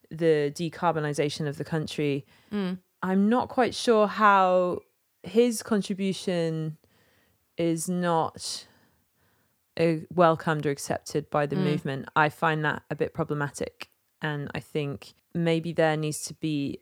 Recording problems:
none

